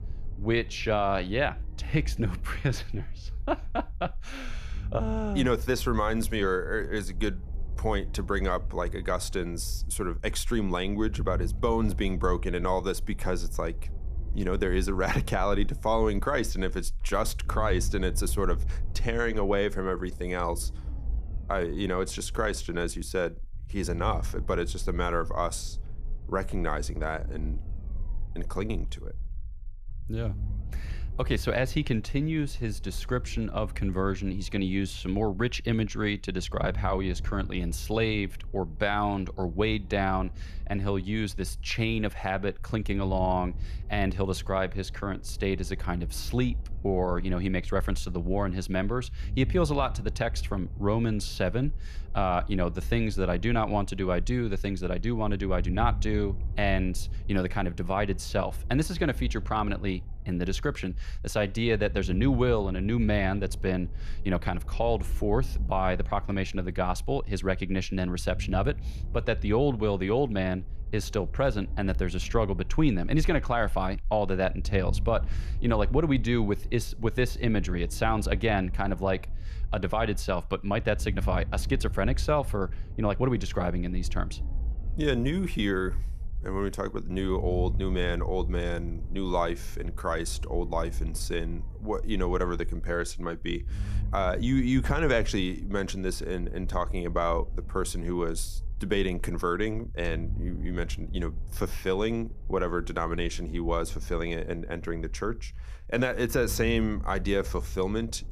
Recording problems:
low rumble; faint; throughout; 25 dB below the speech

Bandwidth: 14.5 kHz